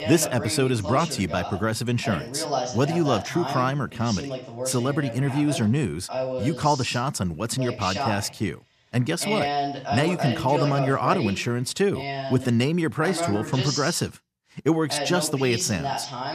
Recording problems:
voice in the background; loud; throughout; 6 dB below the speech

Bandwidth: 14.5 kHz